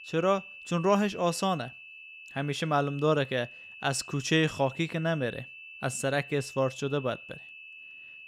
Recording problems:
high-pitched whine; noticeable; throughout; 2.5 kHz, 15 dB below the speech

